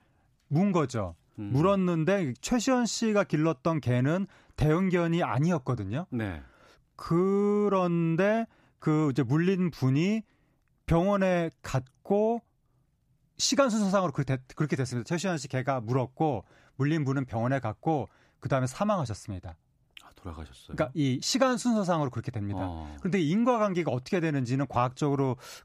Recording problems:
none

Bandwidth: 15 kHz